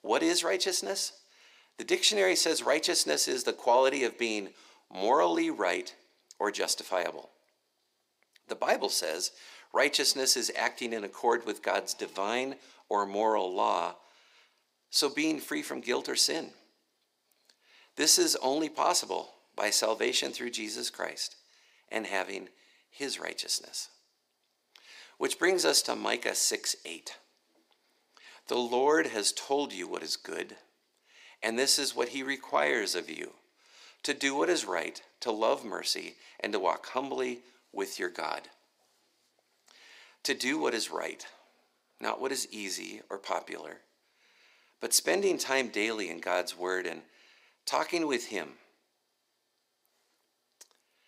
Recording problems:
thin; somewhat; fading below 350 Hz

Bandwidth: 15.5 kHz